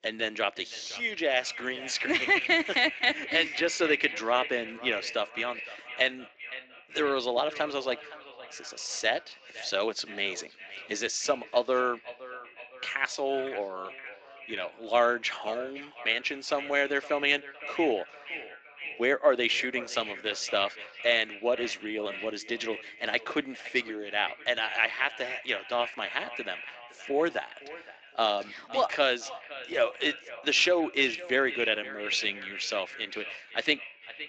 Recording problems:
echo of what is said; strong; throughout; 510 ms later, 10 dB below the speech
thin; somewhat; fading below 300 Hz
garbled, watery; slightly; nothing above 7.5 kHz

